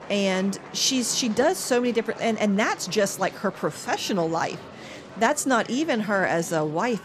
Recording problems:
murmuring crowd; noticeable; throughout; 15 dB below the speech

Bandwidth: 14.5 kHz